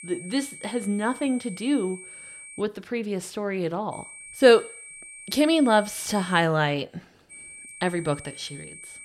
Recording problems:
high-pitched whine; noticeable; until 2.5 s, from 4 to 6.5 s and from 7.5 s on; 2.5 kHz, 15 dB below the speech

